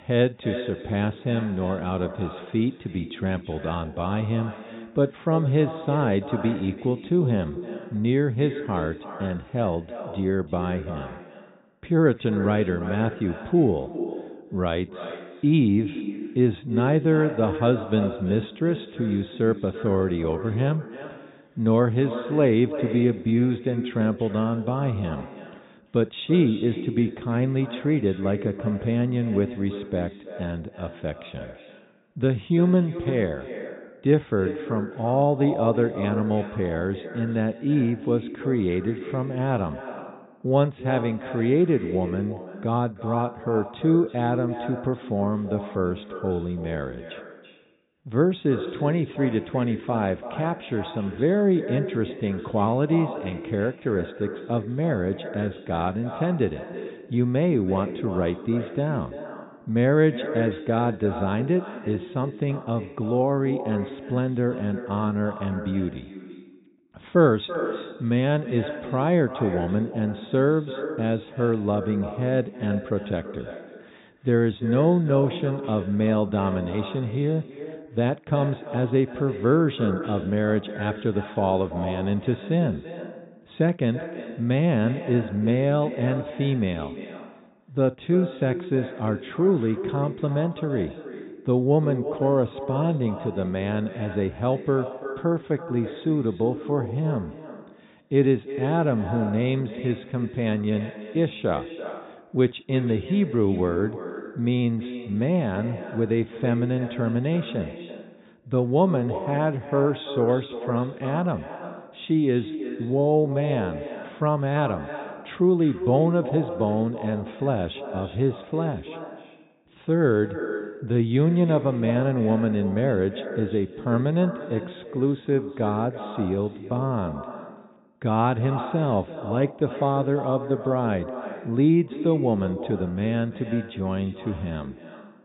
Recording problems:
echo of what is said; strong; throughout; 330 ms later, 10 dB below the speech
high frequencies cut off; severe; nothing above 4 kHz

